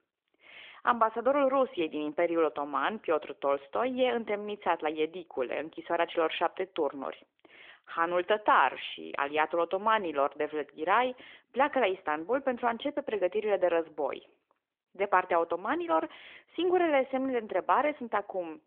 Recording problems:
phone-call audio; nothing above 3.5 kHz

